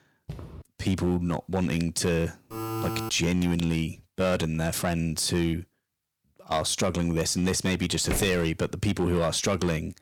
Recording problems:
distortion; slight; 4% of the sound clipped
footsteps; faint; at 0.5 s; peak 15 dB below the speech
alarm; noticeable; at 2.5 s; peak 4 dB below the speech
footsteps; noticeable; at 8 s; peak 6 dB below the speech

